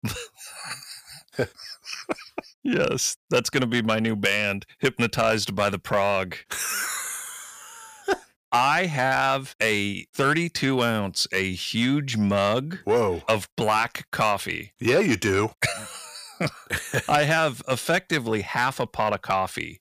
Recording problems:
distortion; slight; 10 dB below the speech

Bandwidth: 15 kHz